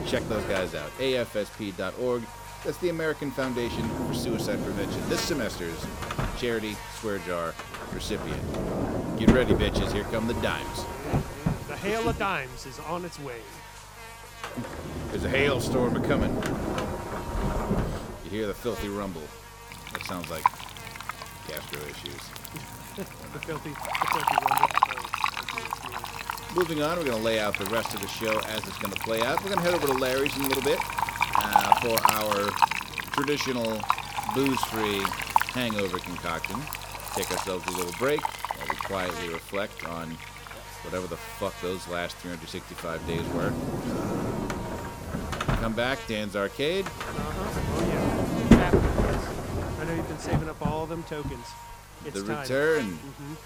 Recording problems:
household noises; very loud; throughout; 1 dB above the speech
electrical hum; loud; throughout; 50 Hz, 10 dB below the speech

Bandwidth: 18.5 kHz